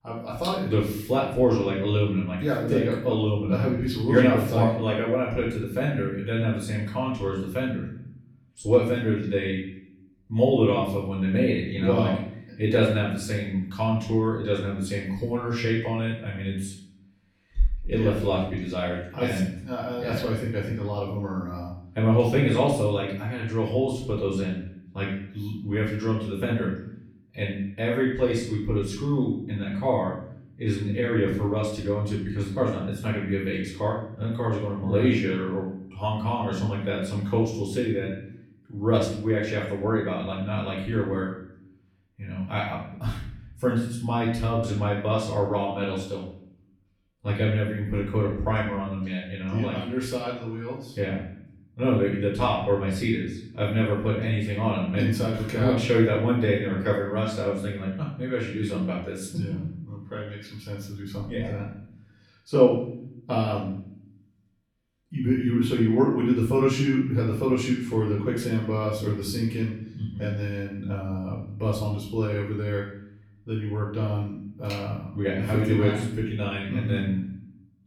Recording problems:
off-mic speech; far
room echo; noticeable; dies away in 0.7 s

